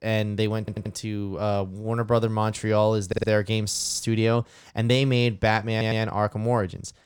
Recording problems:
audio stuttering; 4 times, first at 0.5 s

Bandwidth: 17 kHz